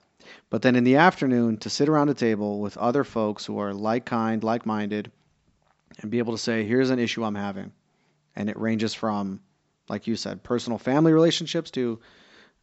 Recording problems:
high frequencies cut off; noticeable; nothing above 7.5 kHz

